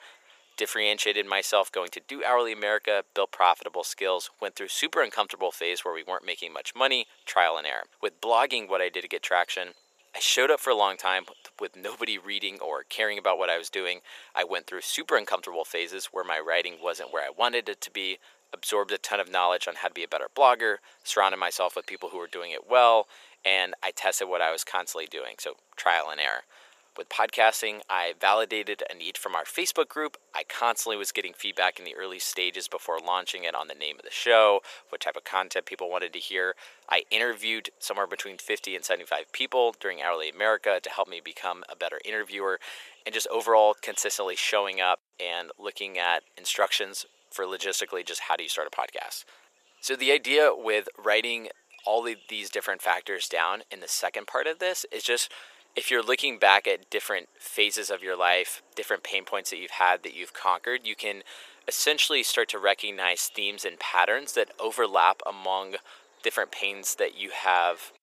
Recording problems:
thin; very; fading below 500 Hz

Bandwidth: 14.5 kHz